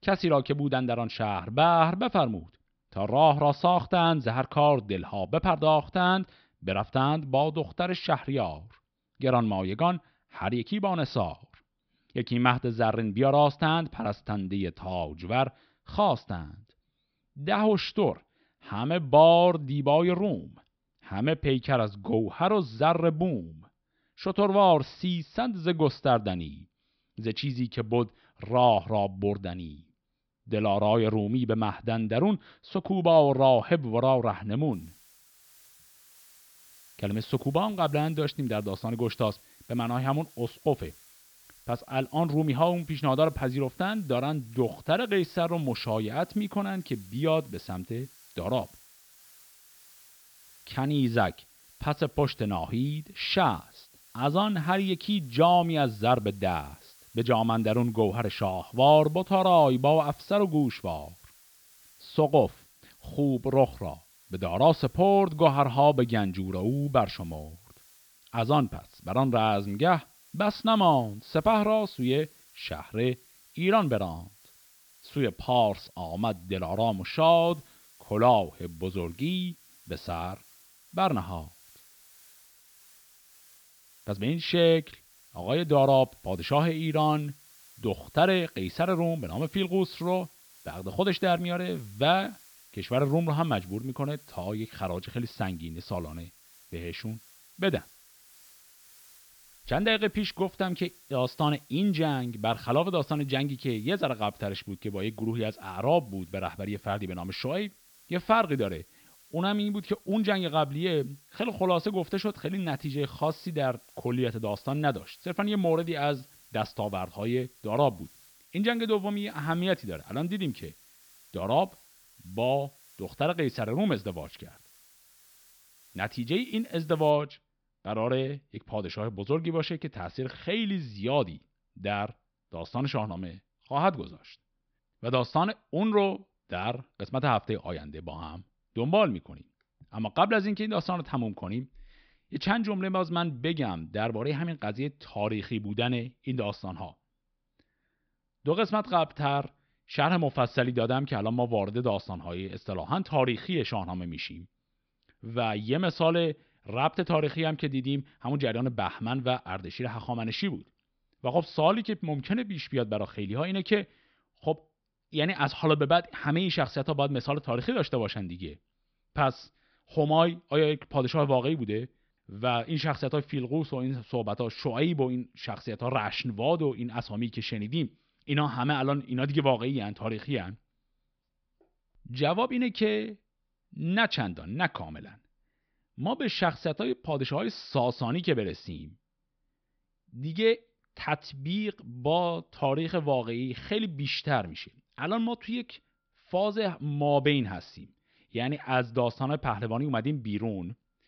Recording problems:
high frequencies cut off; noticeable; nothing above 5.5 kHz
hiss; faint; from 35 s to 2:07; 25 dB below the speech

